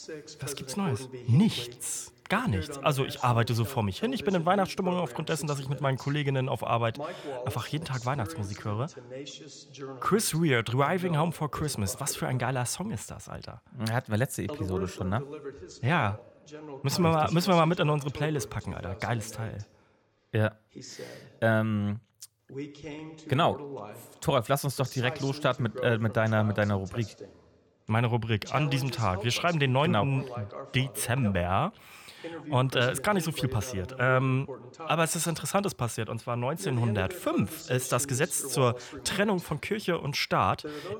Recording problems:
voice in the background; noticeable; throughout; 15 dB below the speech

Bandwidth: 18.5 kHz